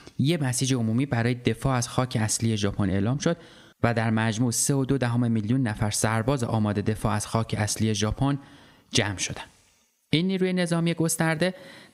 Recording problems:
squashed, flat; somewhat

